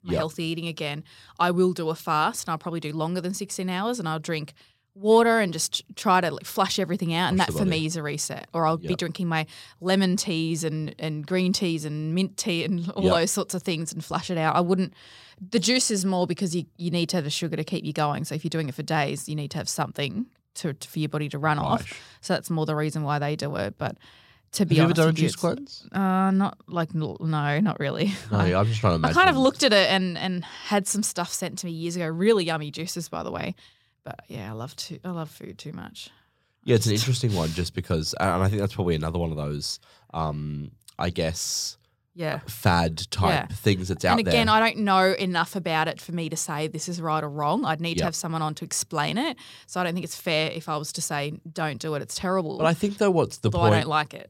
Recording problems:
none

